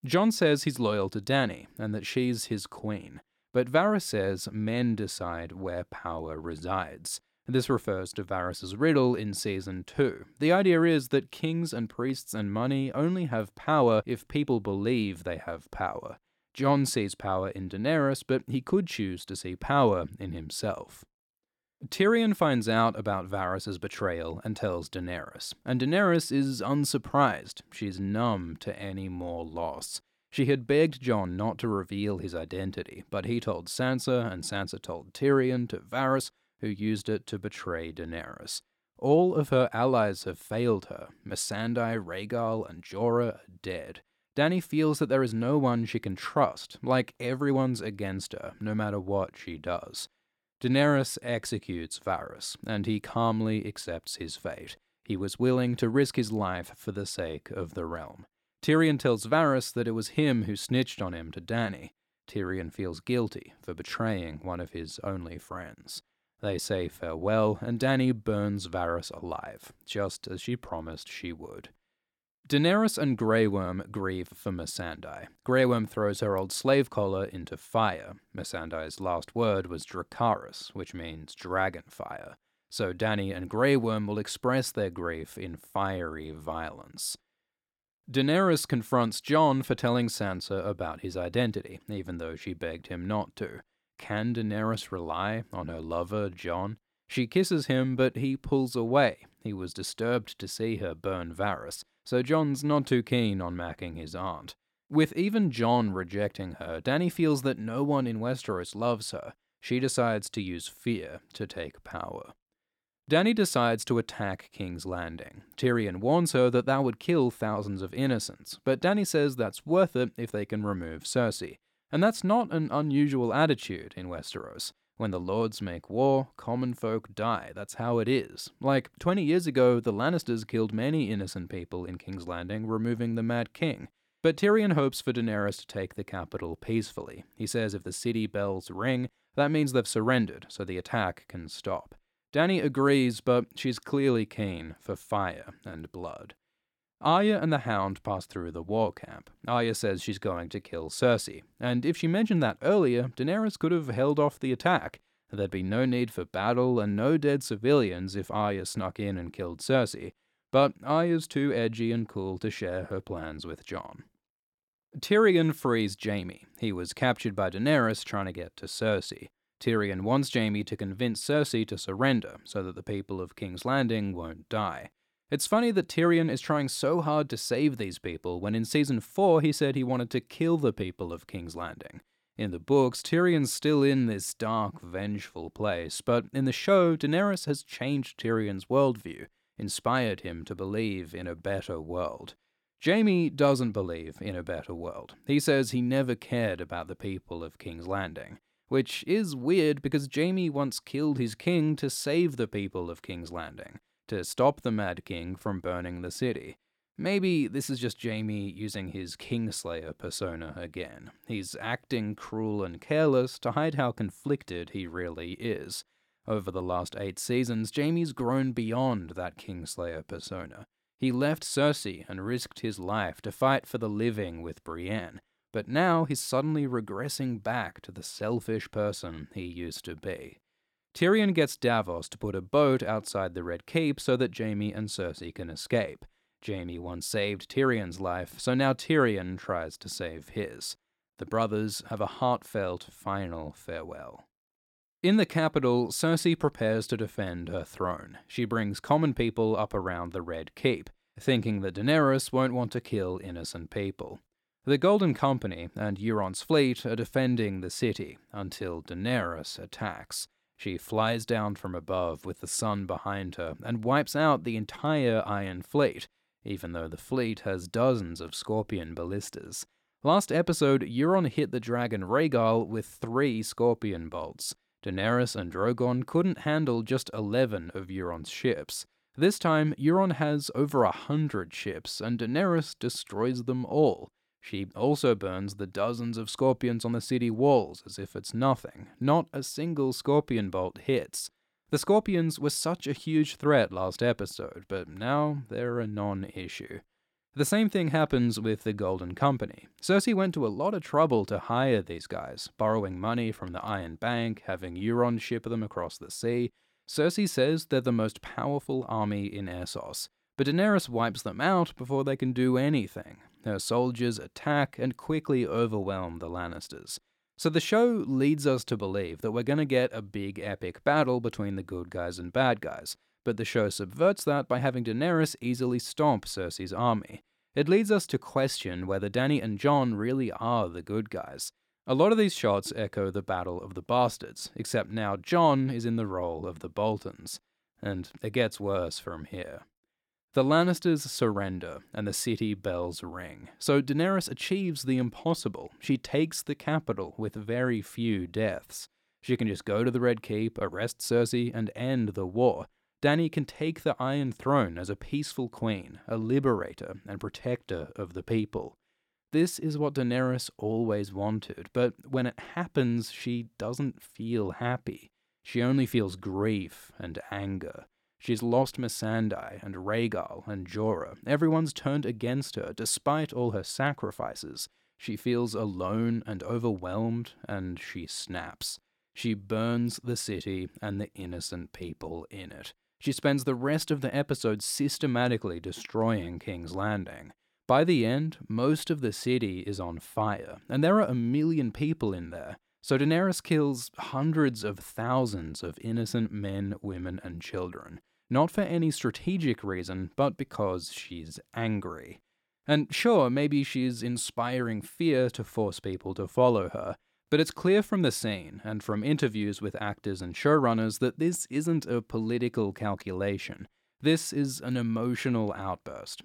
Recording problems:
none

